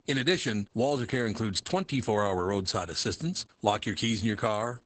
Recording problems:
garbled, watery; badly; nothing above 8 kHz

